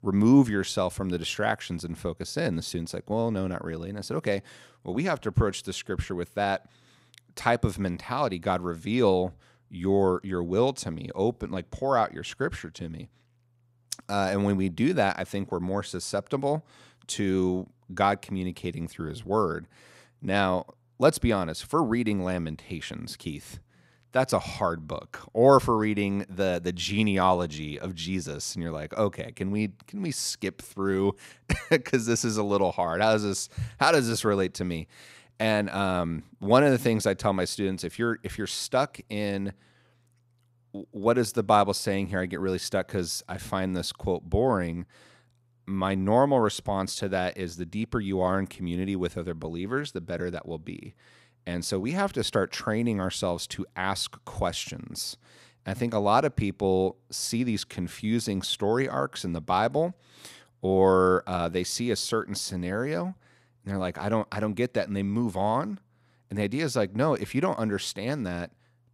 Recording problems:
none

